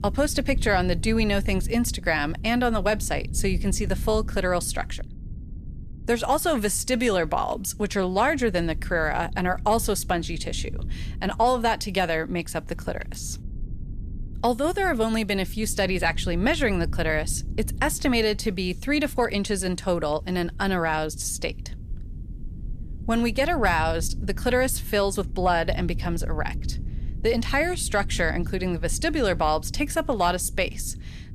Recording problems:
low rumble; faint; throughout; 25 dB below the speech

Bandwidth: 14.5 kHz